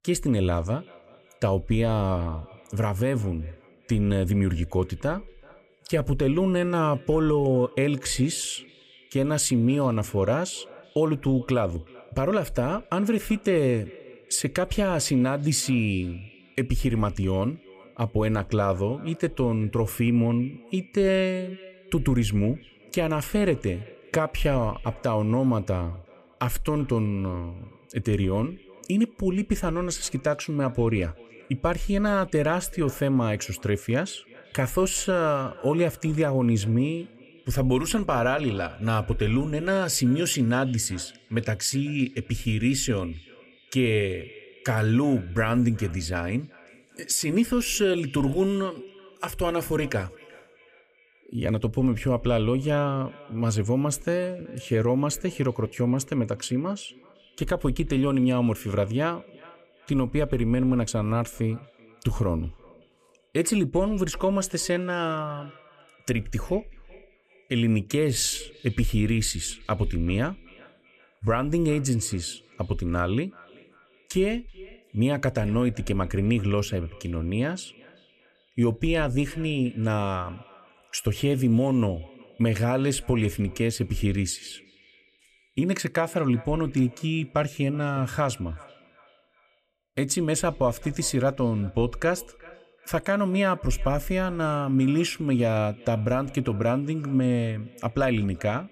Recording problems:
echo of what is said; faint; throughout; 380 ms later, 25 dB below the speech

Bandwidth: 15.5 kHz